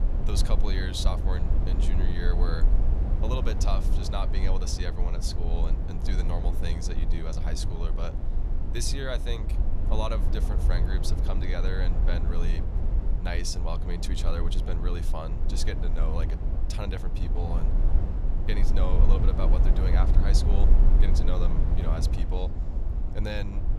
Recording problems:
low rumble; loud; throughout; 5 dB below the speech

